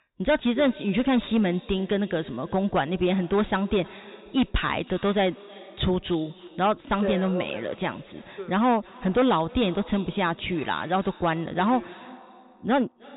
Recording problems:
high frequencies cut off; severe; nothing above 4 kHz
echo of what is said; faint; throughout; 310 ms later, 20 dB below the speech
distortion; slight; 5% of the sound clipped

